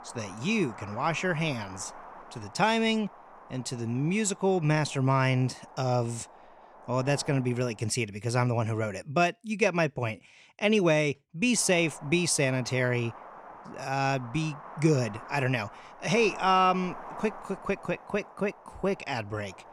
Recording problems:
wind noise on the microphone; occasional gusts; until 8 s and from 12 s on; 15 dB below the speech

